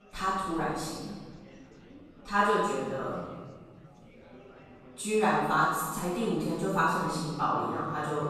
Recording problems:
room echo; strong; dies away in 1.5 s
off-mic speech; far
chatter from many people; faint; throughout; 20 dB below the speech

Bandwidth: 13.5 kHz